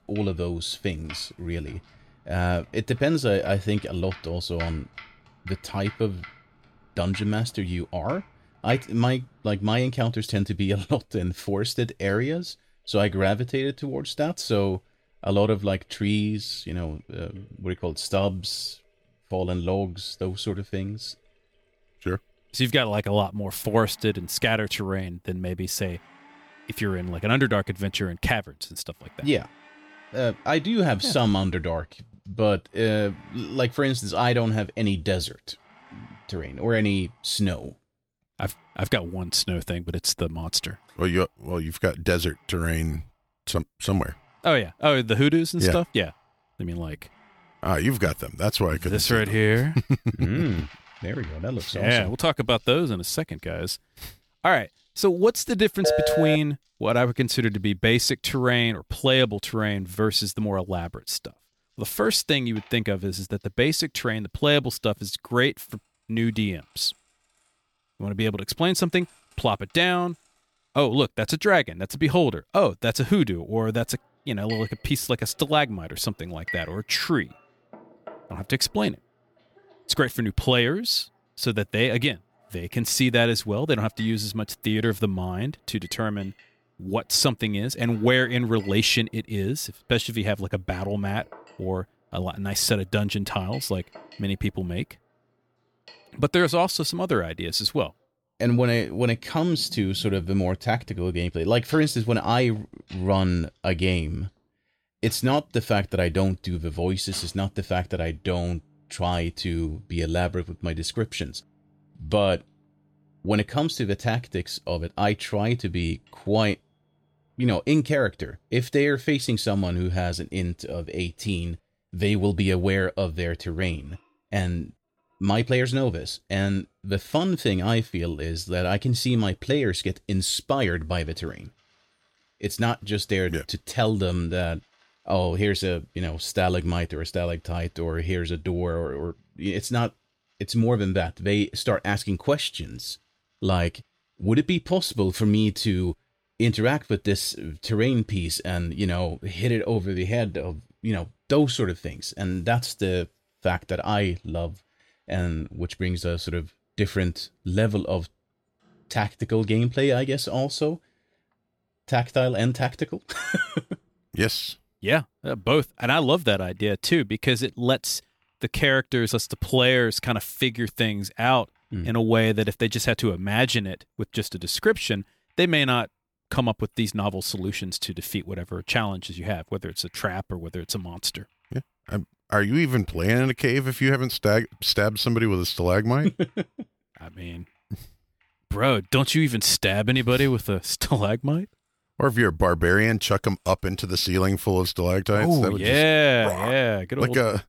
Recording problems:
household noises; faint; throughout; 25 dB below the speech
phone ringing; loud; at 56 s; peak 3 dB above the speech

